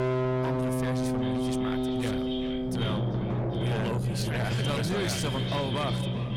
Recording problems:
distortion; heavy; 7 dB below the speech
echo of what is said; strong; throughout; 390 ms later, 7 dB below the speech
background music; very loud; throughout; 3 dB above the speech
low rumble; faint; throughout; 20 dB below the speech

